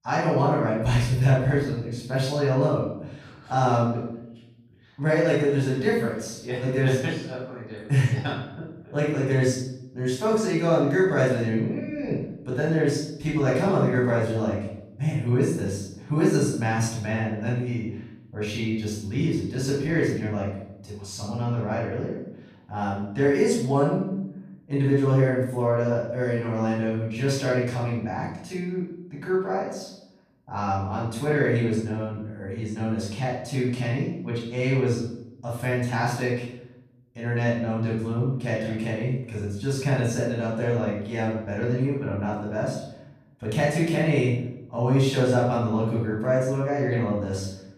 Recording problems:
off-mic speech; far
room echo; noticeable; dies away in 0.7 s

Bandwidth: 14.5 kHz